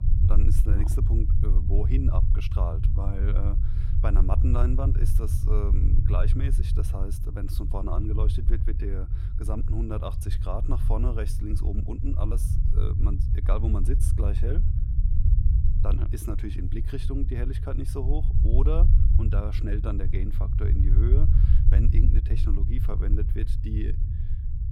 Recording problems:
low rumble; loud; throughout; 5 dB below the speech

